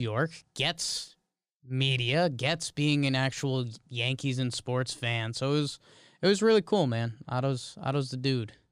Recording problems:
abrupt cut into speech; at the start

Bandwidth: 15 kHz